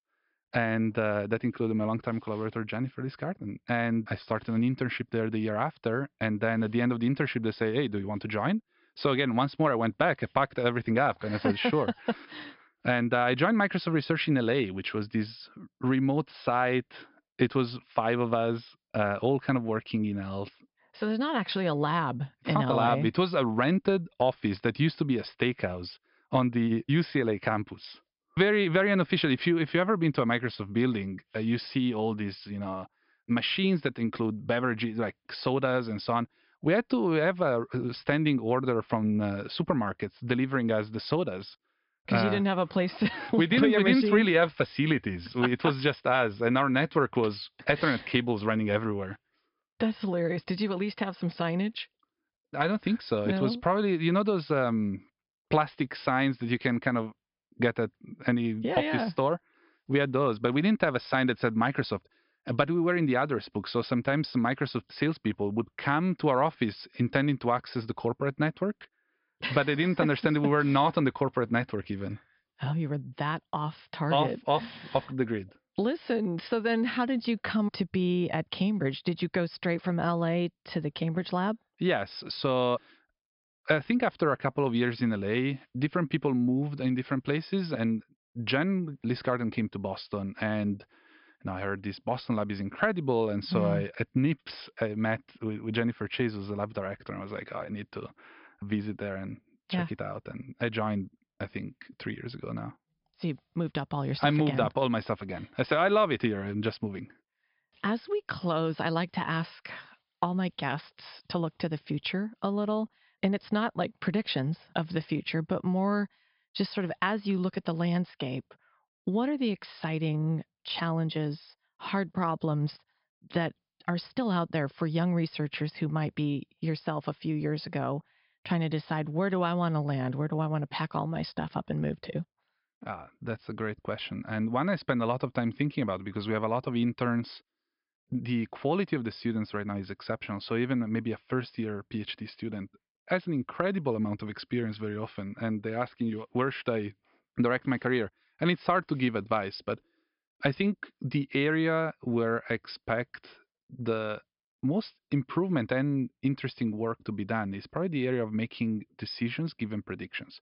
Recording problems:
high frequencies cut off; noticeable; nothing above 5.5 kHz

